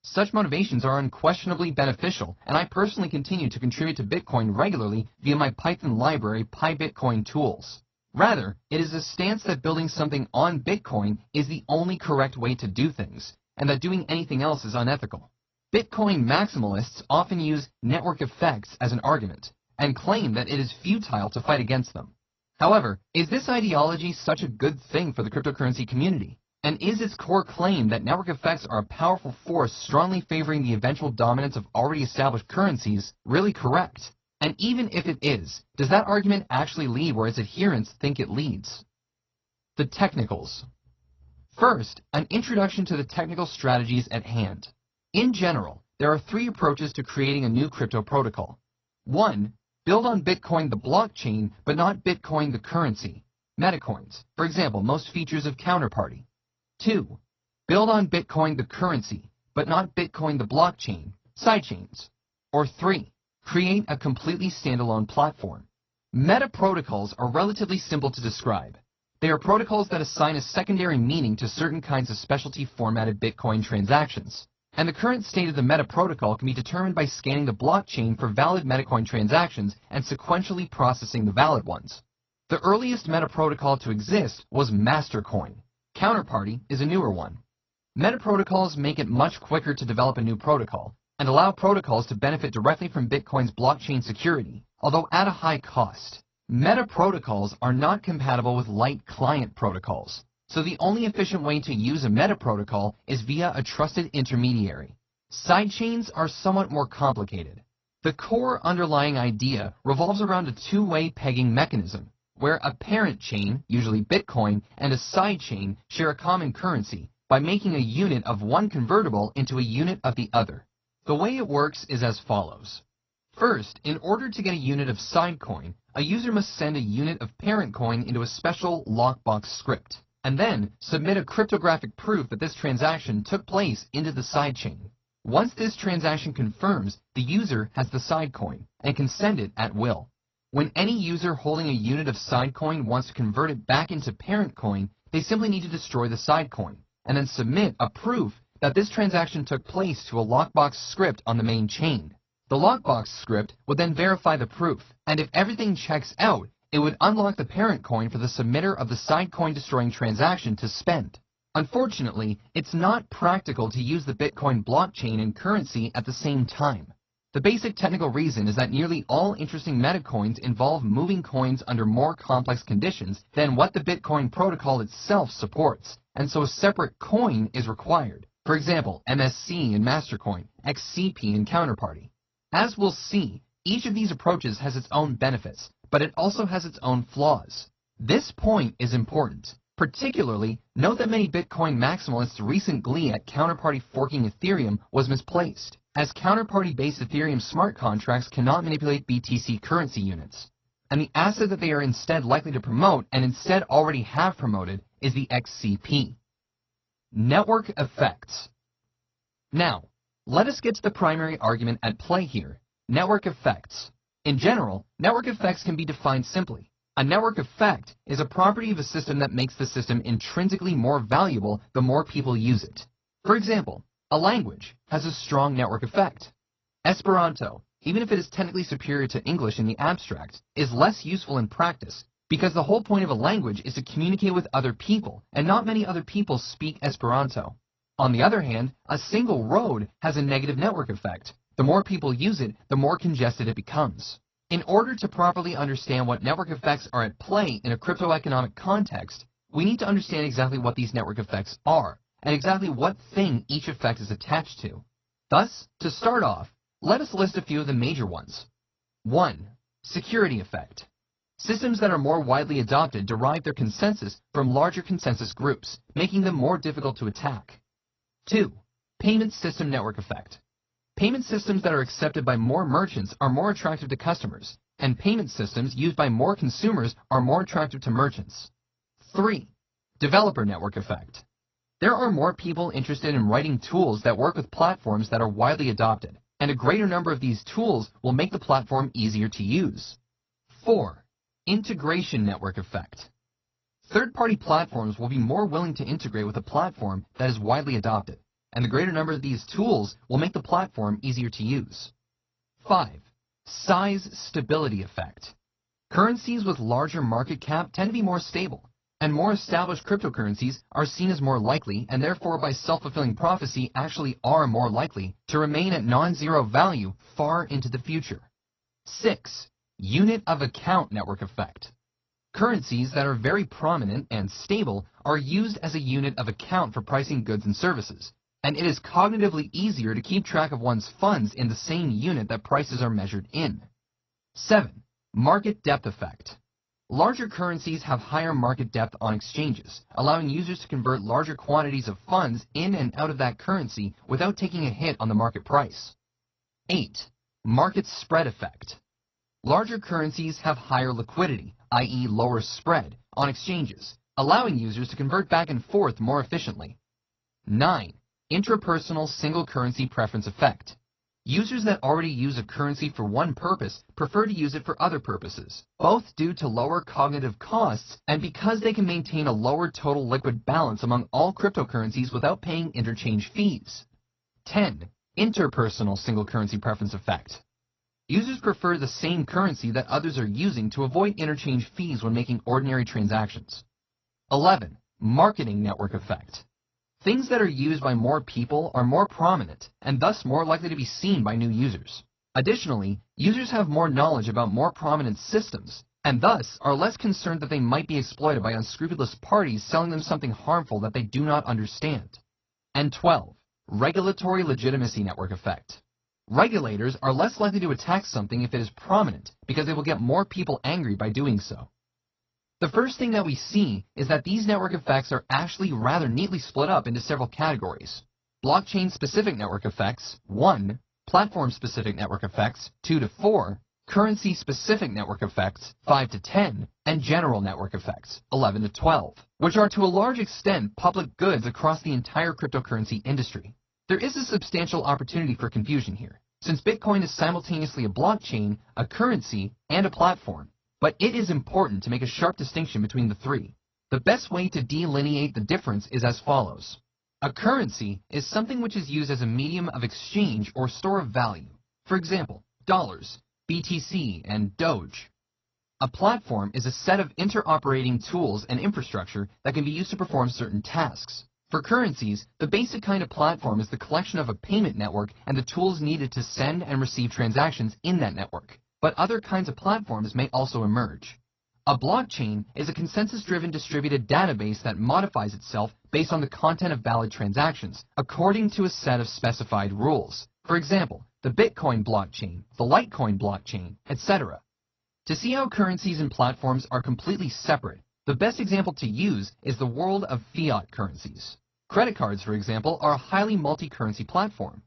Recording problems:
garbled, watery; slightly; nothing above 6 kHz

